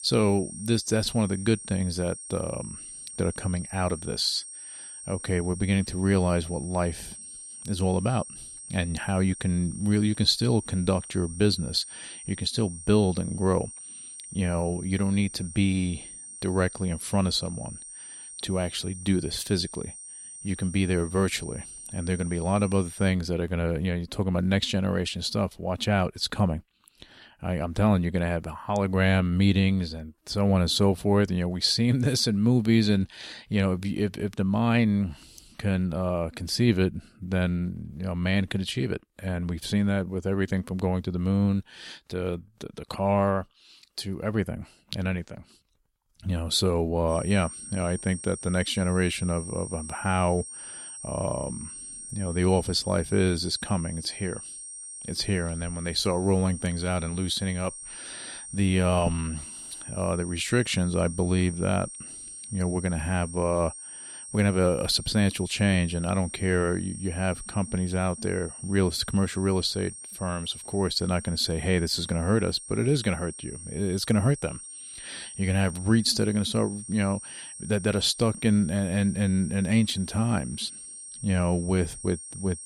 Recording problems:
high-pitched whine; noticeable; until 23 s and from 47 s on; 8.5 kHz, 10 dB below the speech

